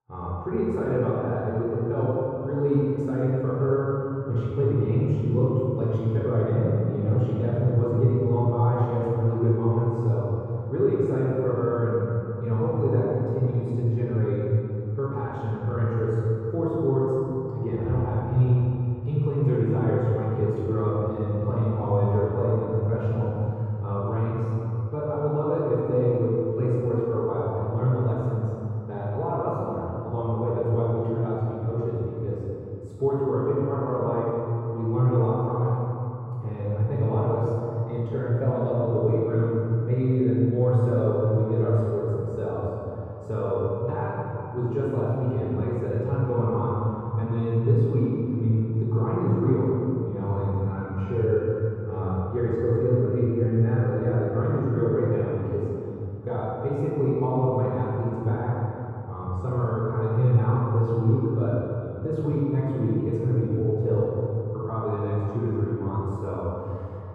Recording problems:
room echo; strong; dies away in 2.8 s
off-mic speech; far
muffled; very; fading above 1.5 kHz

